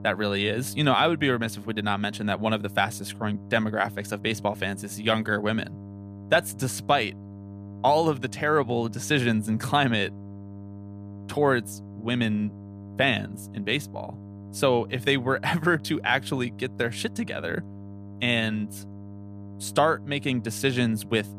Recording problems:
electrical hum; faint; throughout; 50 Hz, 25 dB below the speech

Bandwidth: 14.5 kHz